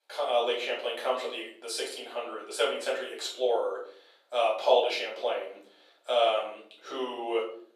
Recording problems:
off-mic speech; far
thin; very; fading below 350 Hz
room echo; noticeable; dies away in 0.4 s

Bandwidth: 15 kHz